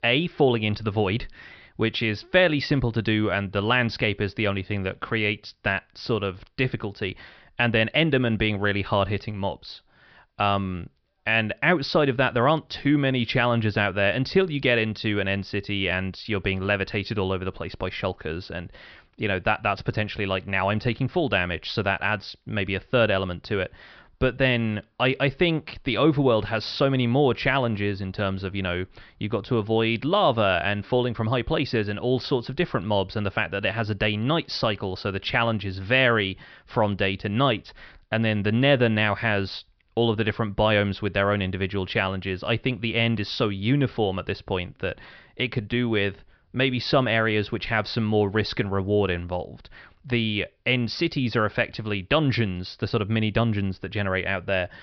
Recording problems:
high frequencies cut off; noticeable; nothing above 5.5 kHz

